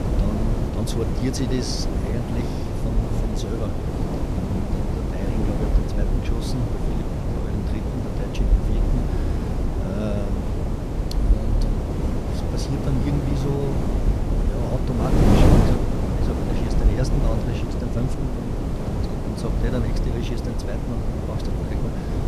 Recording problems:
wind noise on the microphone; heavy; 4 dB above the speech
low rumble; noticeable; throughout; 15 dB below the speech

